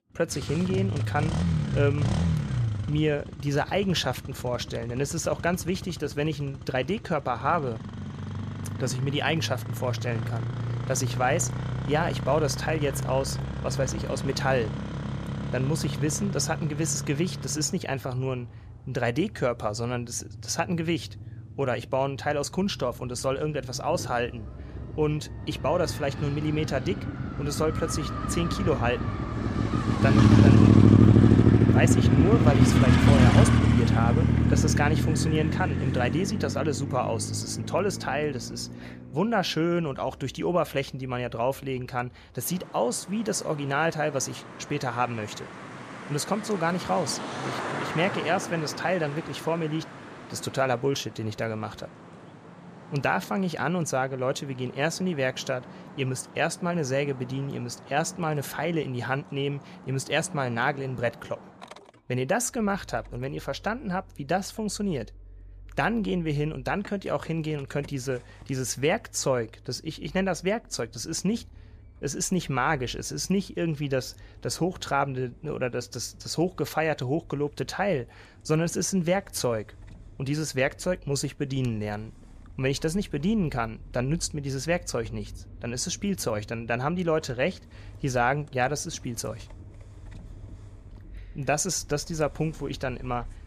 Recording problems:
traffic noise; very loud; throughout; 3 dB above the speech

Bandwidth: 14.5 kHz